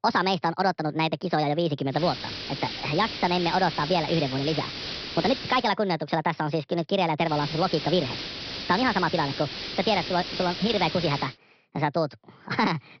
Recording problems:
wrong speed and pitch; too fast and too high; 1.5 times normal speed
high frequencies cut off; noticeable; nothing above 5.5 kHz
hiss; loud; from 2 to 5.5 s and from 7.5 to 11 s; 7 dB below the speech

